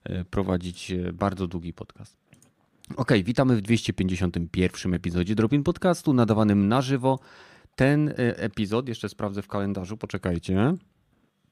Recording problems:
none

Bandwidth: 15 kHz